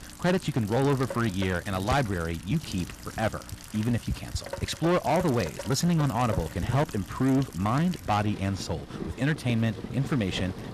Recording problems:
distortion; slight; 7% of the sound clipped
rain or running water; noticeable; throughout; 10 dB below the speech
electrical hum; faint; until 3.5 s and from 6 s on; 60 Hz, 25 dB below the speech

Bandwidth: 14 kHz